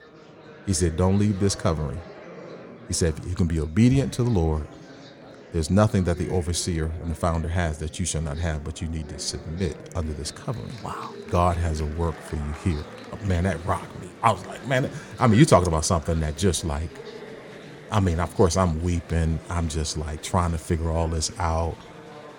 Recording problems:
murmuring crowd; noticeable; throughout; 20 dB below the speech

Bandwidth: 17.5 kHz